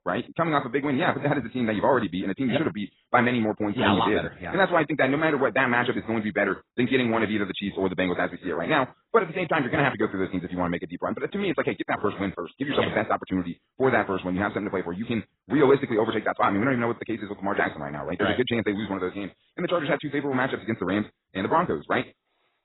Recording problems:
garbled, watery; badly; nothing above 4 kHz
wrong speed, natural pitch; too fast; 1.5 times normal speed

